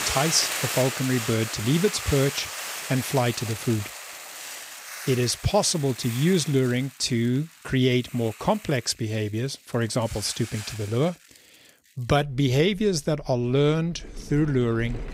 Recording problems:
household noises; loud; throughout; 8 dB below the speech

